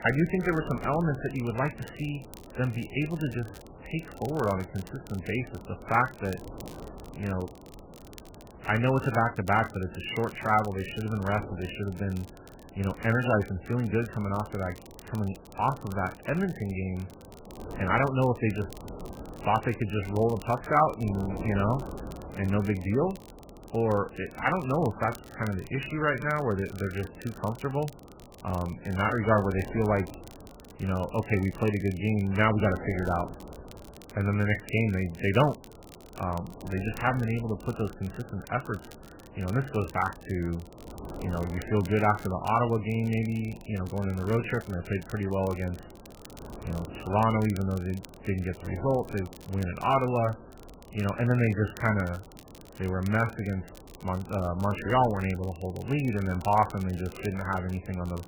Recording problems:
garbled, watery; badly; nothing above 3 kHz
wind noise on the microphone; occasional gusts; 20 dB below the speech
crackle, like an old record; faint; 25 dB below the speech

